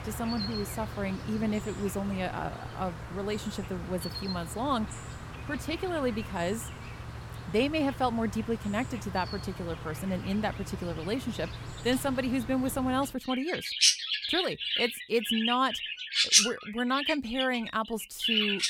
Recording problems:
animal sounds; loud; throughout; as loud as the speech

